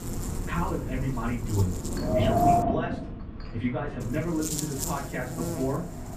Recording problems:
off-mic speech; far
muffled; slightly; fading above 2.5 kHz
room echo; slight; dies away in 0.3 s
wind in the background; very loud; throughout; 1 dB above the speech
electrical hum; loud; until 2.5 s and from 4 s on; 50 Hz, 6 dB below the speech
household noises; faint; until 3.5 s; 25 dB below the speech

